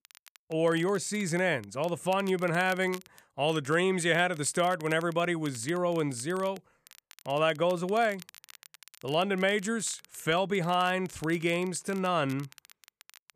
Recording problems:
crackle, like an old record; faint; 25 dB below the speech

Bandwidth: 14.5 kHz